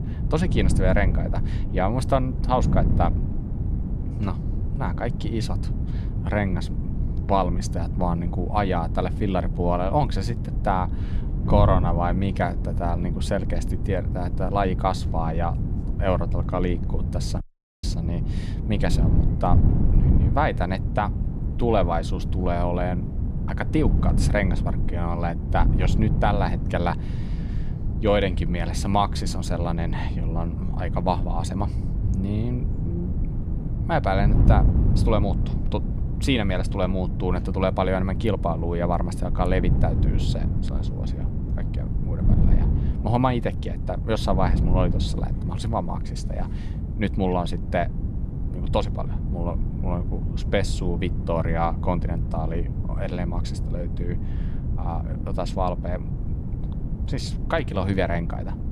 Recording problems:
wind noise on the microphone; occasional gusts; 10 dB below the speech
audio cutting out; at 17 s

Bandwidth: 15.5 kHz